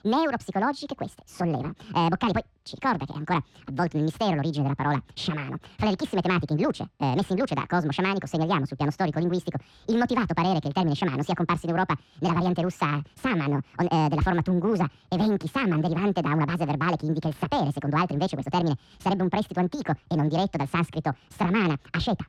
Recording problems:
wrong speed and pitch; too fast and too high; 1.7 times normal speed
muffled; slightly; fading above 3 kHz

